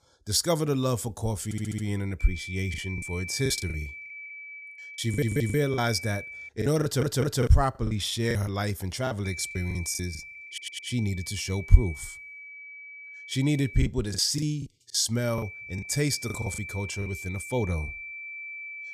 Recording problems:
high-pitched whine; noticeable; from 2 to 6.5 s, from 9.5 to 14 s and from 15 s on; 2.5 kHz, 10 dB below the speech
audio stuttering; 4 times, first at 1.5 s
choppy; very; from 2.5 to 6 s, from 6.5 to 10 s and from 14 to 17 s; 14% of the speech affected

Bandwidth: 15 kHz